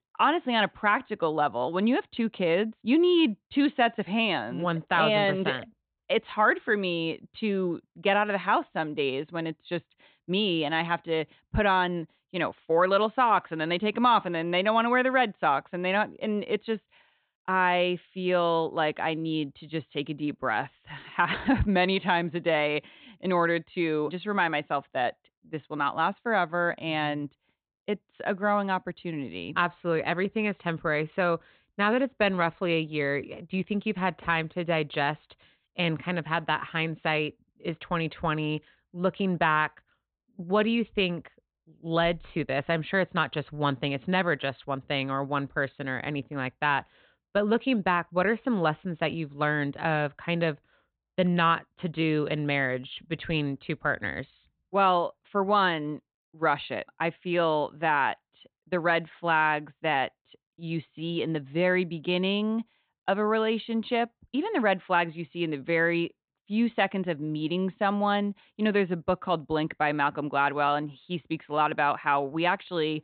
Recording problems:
high frequencies cut off; severe; nothing above 4 kHz

